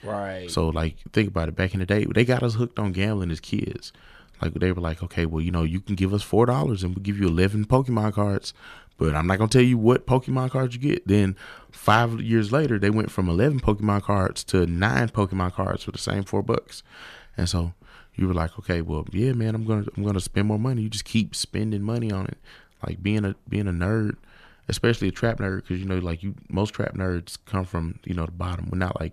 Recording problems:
none

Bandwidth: 14.5 kHz